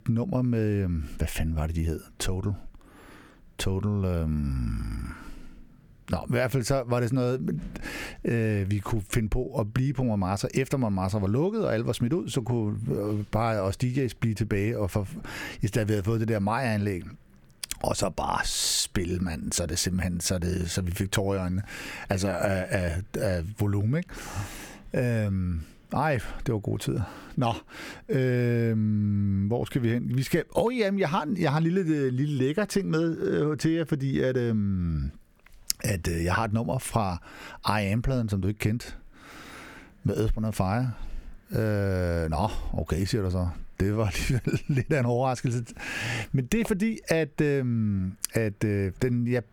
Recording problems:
squashed, flat; heavily

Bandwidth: 18.5 kHz